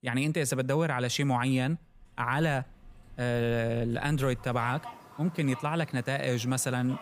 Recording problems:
animal sounds; noticeable; throughout; 20 dB below the speech

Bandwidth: 15 kHz